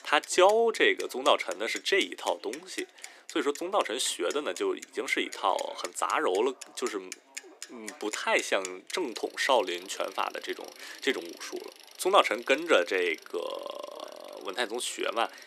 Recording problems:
thin; somewhat; fading below 300 Hz
traffic noise; noticeable; throughout; 15 dB below the speech
background chatter; faint; throughout; 3 voices, 30 dB below the speech

